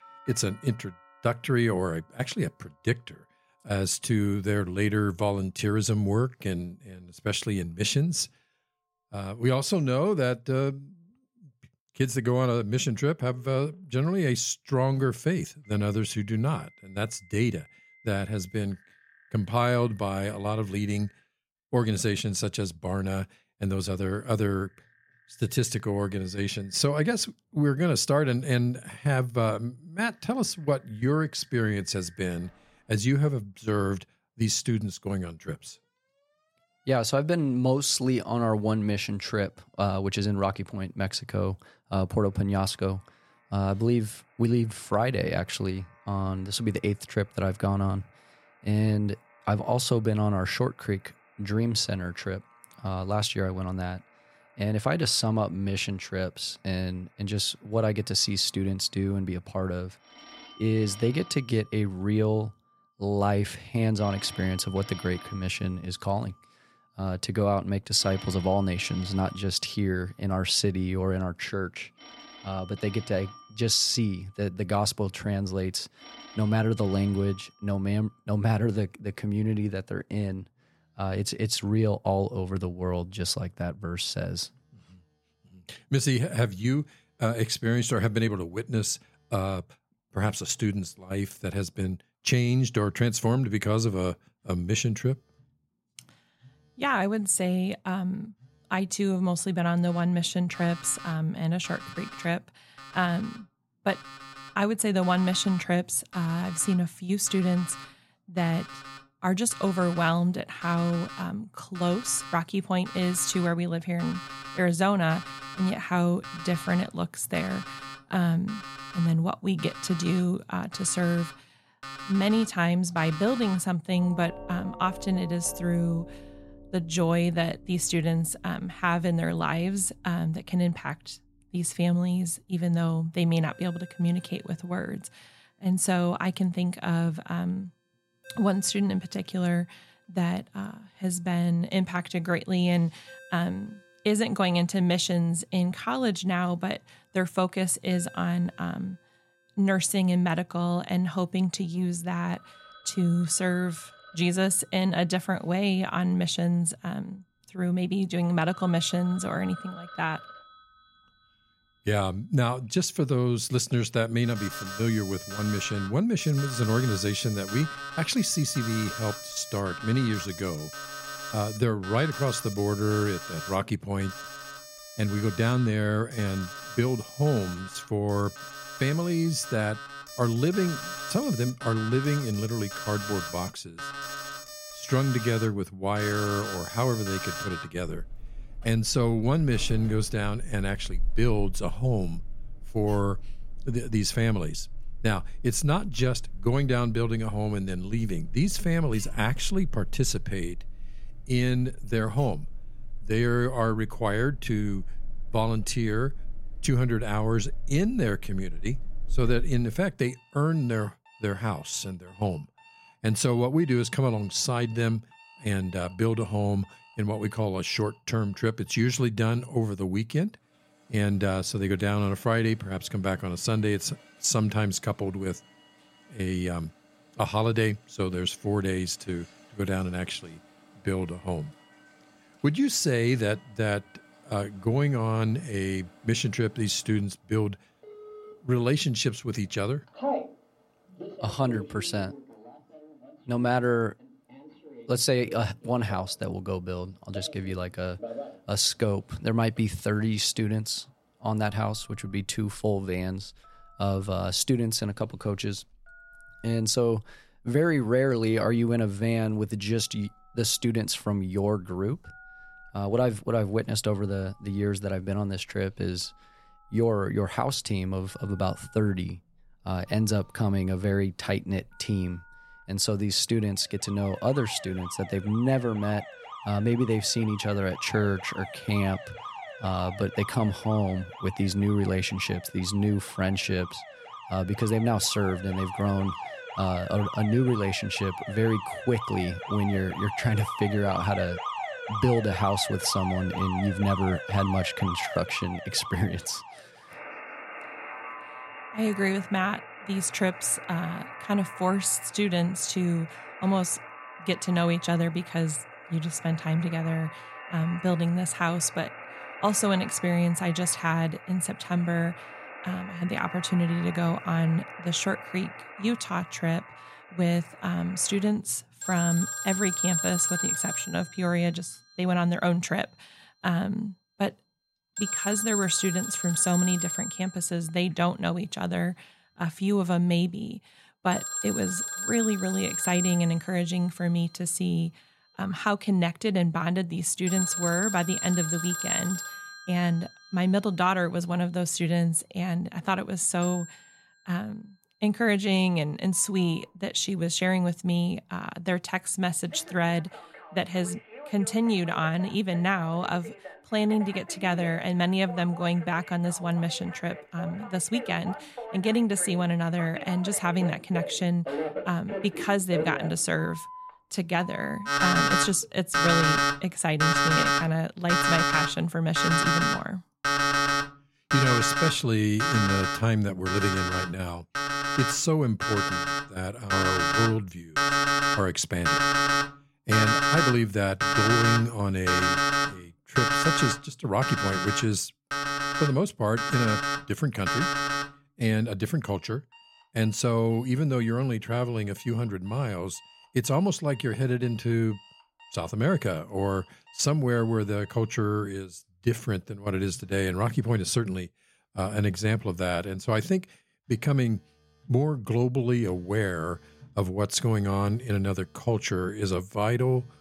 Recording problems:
alarms or sirens; loud; throughout; 5 dB below the speech

